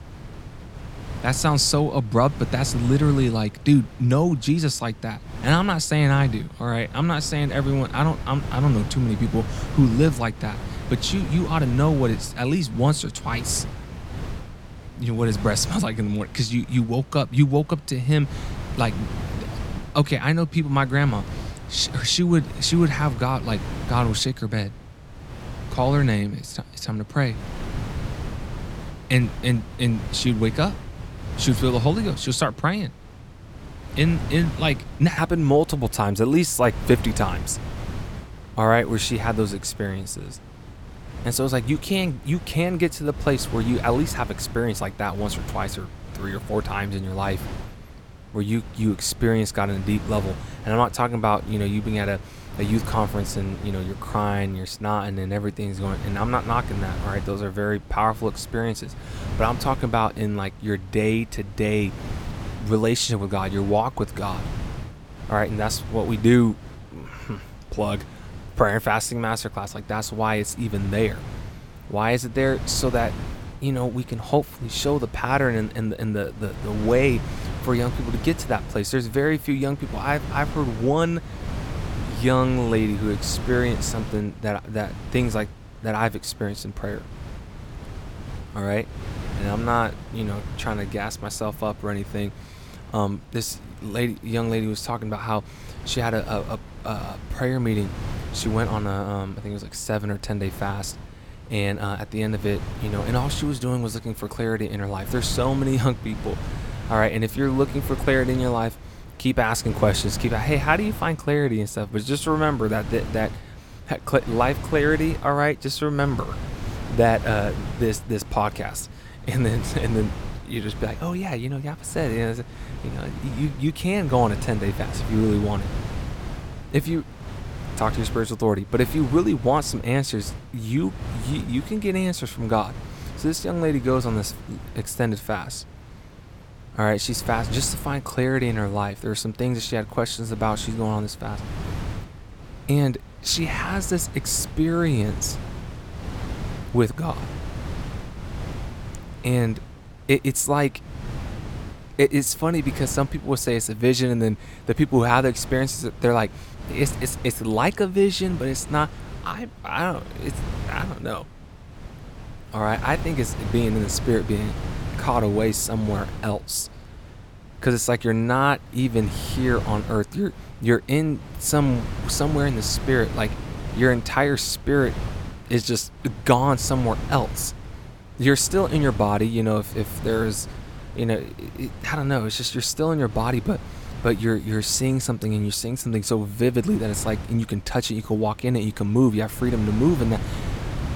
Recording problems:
wind noise on the microphone; occasional gusts; 15 dB below the speech

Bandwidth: 17.5 kHz